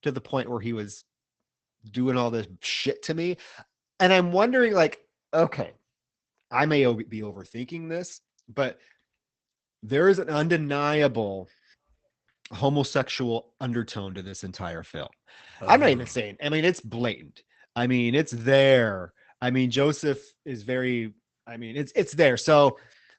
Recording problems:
garbled, watery; badly; nothing above 8 kHz

